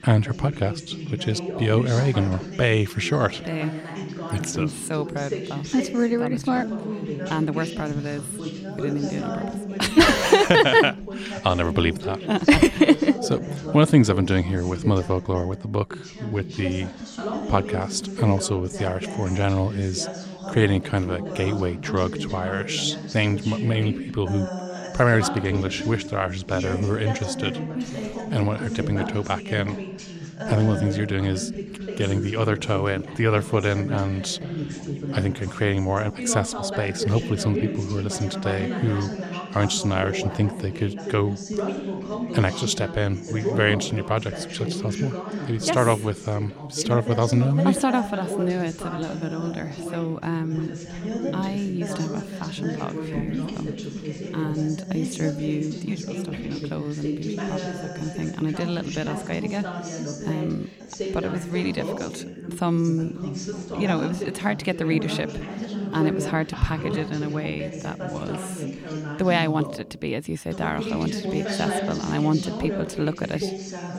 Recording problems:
background chatter; loud; throughout; 2 voices, 7 dB below the speech

